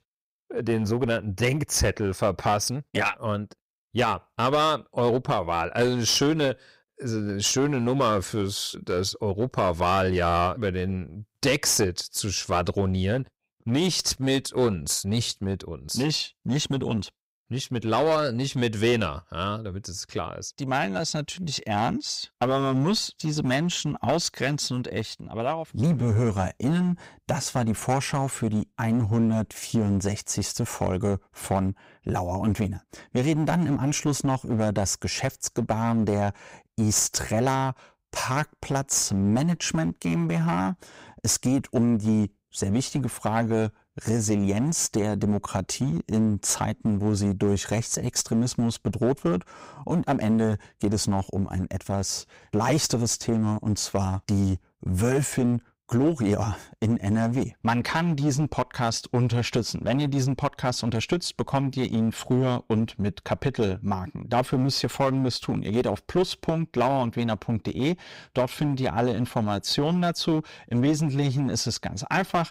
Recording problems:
distortion; slight; 7% of the sound clipped

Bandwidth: 15.5 kHz